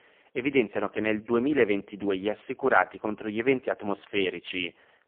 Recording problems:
phone-call audio; poor line; nothing above 3 kHz

